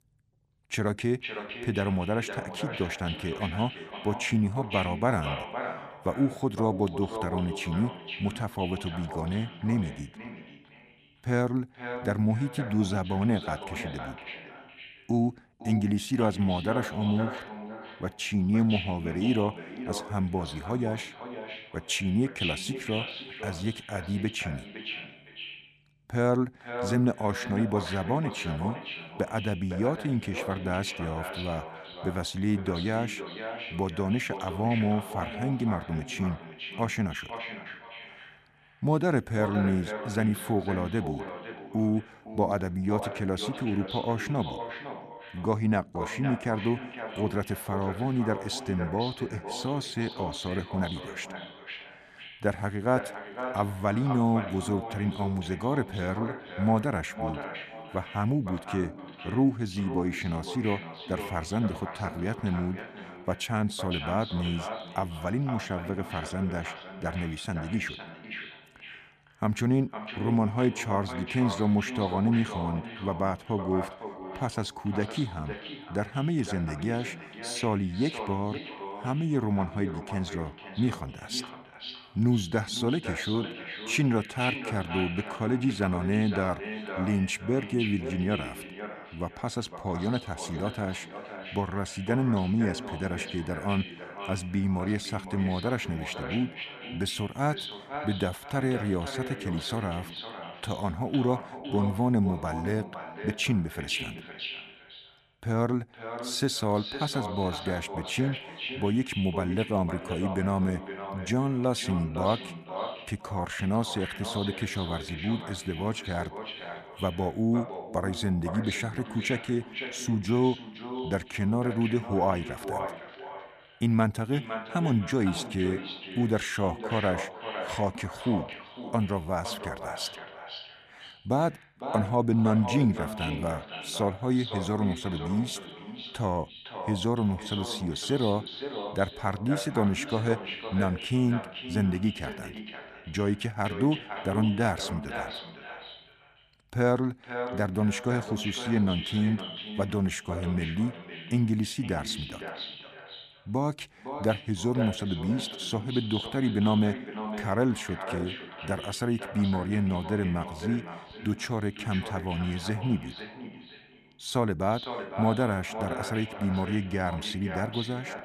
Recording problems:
echo of what is said; strong; throughout; 510 ms later, 9 dB below the speech

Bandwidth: 14.5 kHz